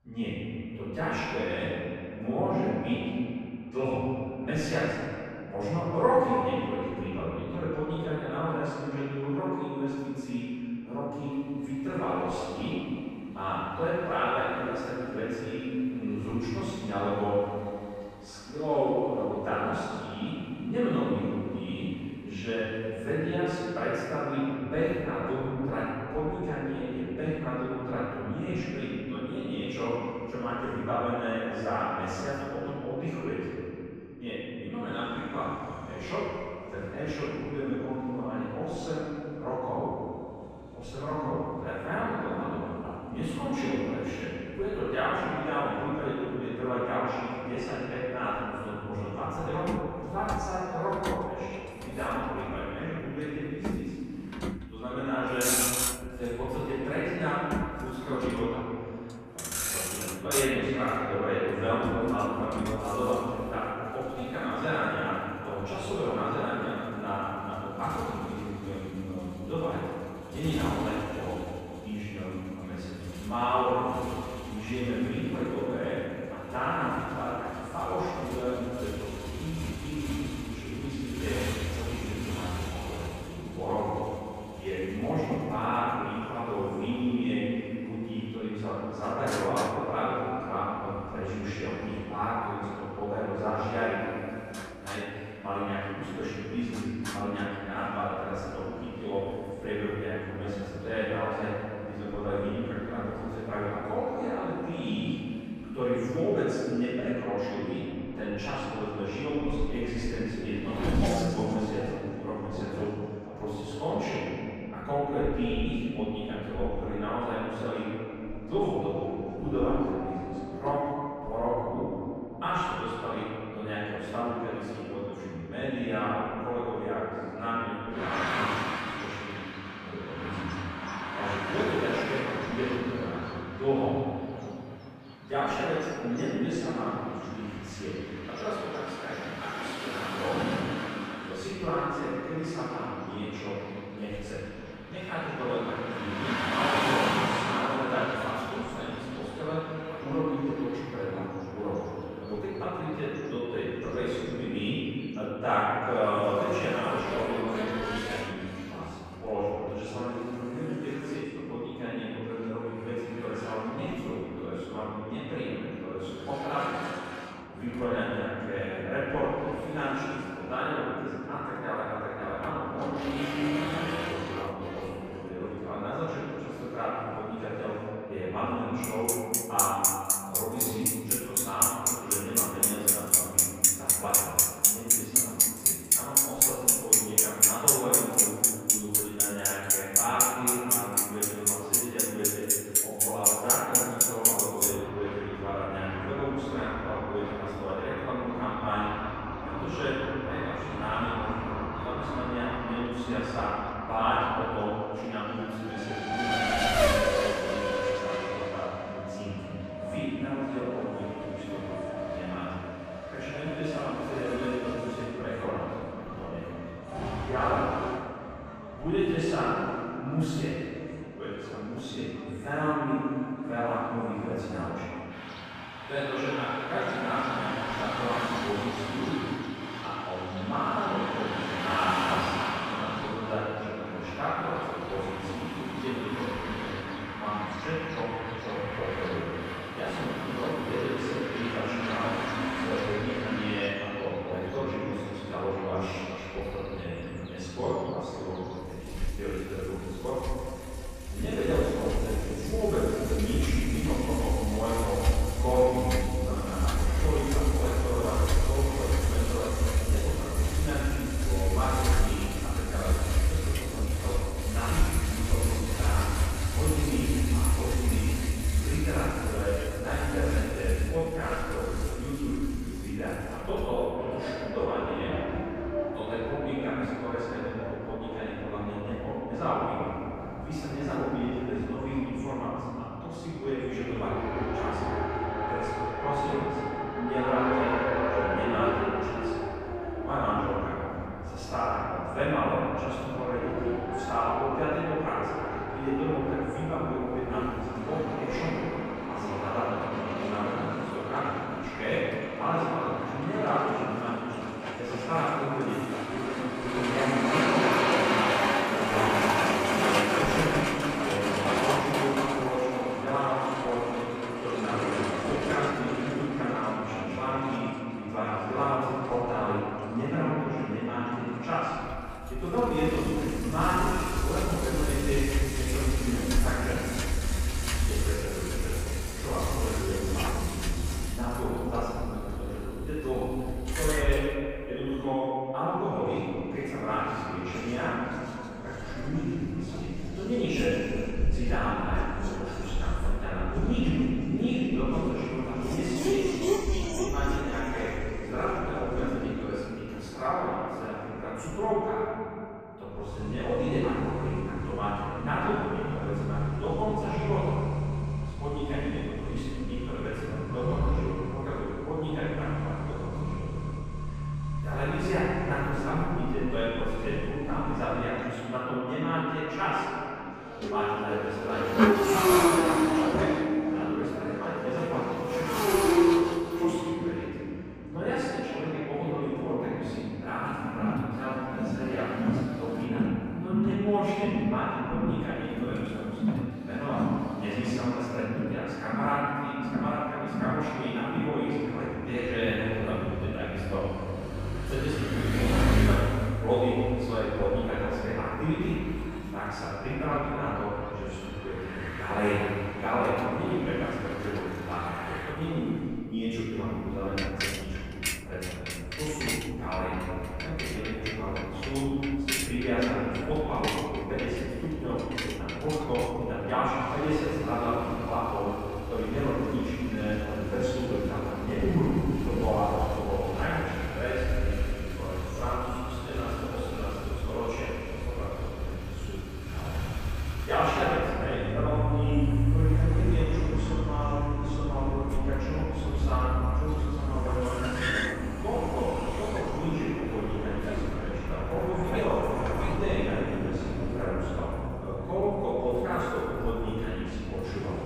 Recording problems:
room echo; strong; dies away in 2.5 s
off-mic speech; far
traffic noise; very loud; throughout; 1 dB above the speech

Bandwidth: 15 kHz